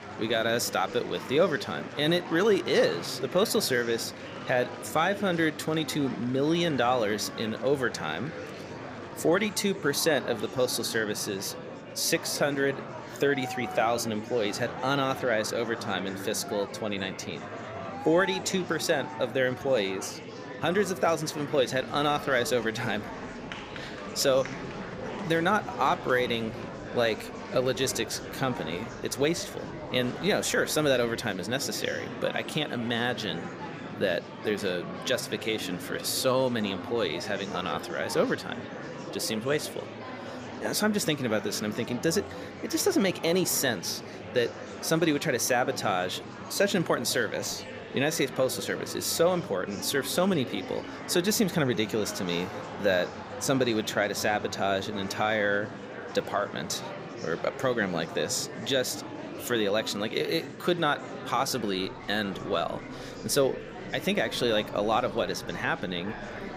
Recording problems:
murmuring crowd; noticeable; throughout; 10 dB below the speech

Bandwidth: 15 kHz